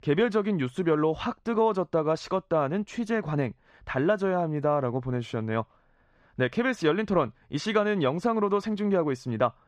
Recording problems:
muffled; slightly; fading above 3.5 kHz

